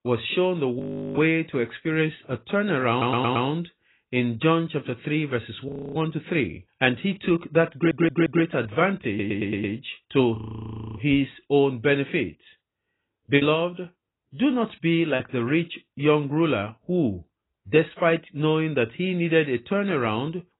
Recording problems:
garbled, watery; badly; nothing above 4 kHz
audio freezing; at 1 s, at 5.5 s and at 10 s for 0.5 s
audio stuttering; at 3 s, at 7.5 s and at 9 s
choppy; very; from 13 to 15 s; 7% of the speech affected

